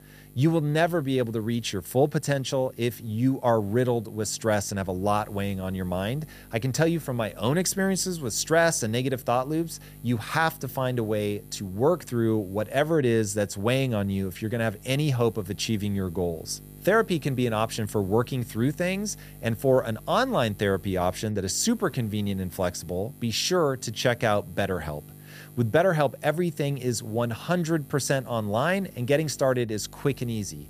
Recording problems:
electrical hum; faint; throughout; 50 Hz, 25 dB below the speech

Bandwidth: 15 kHz